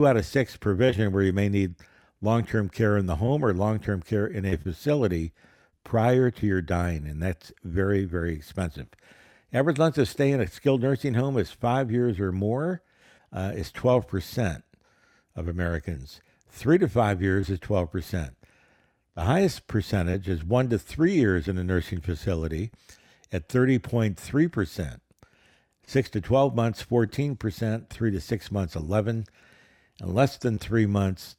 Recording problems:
abrupt cut into speech; at the start

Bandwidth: 17 kHz